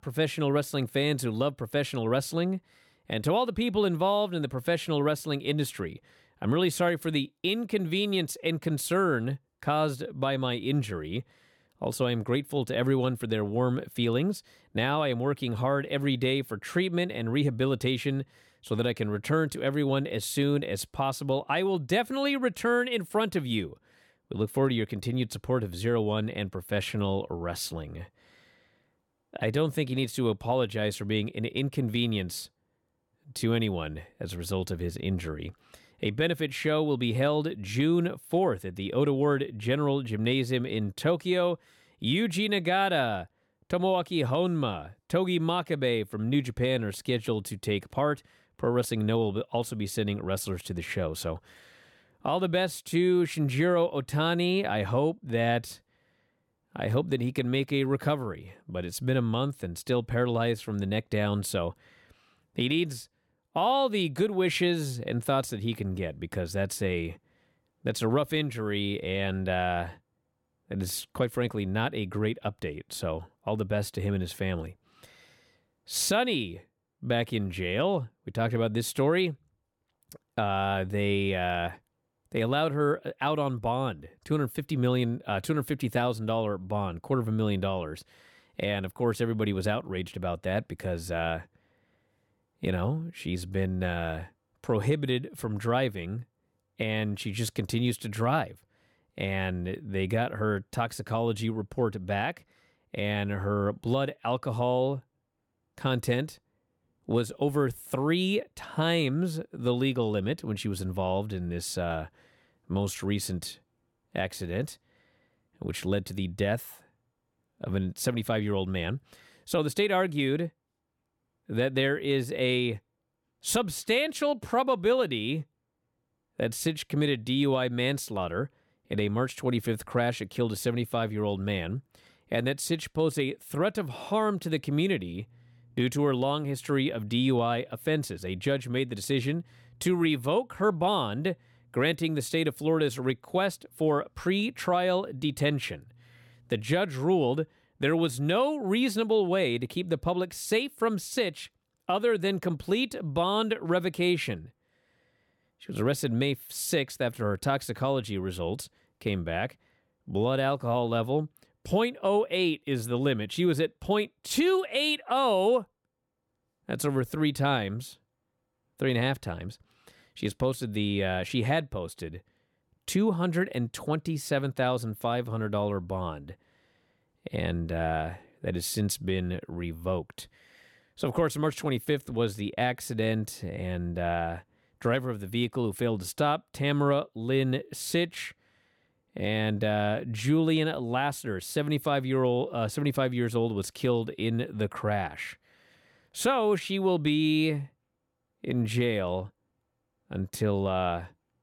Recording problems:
none

